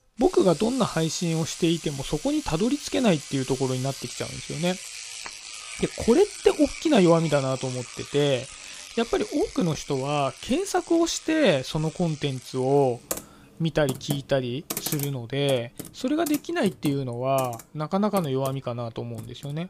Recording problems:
household noises; noticeable; throughout; 10 dB below the speech

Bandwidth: 15.5 kHz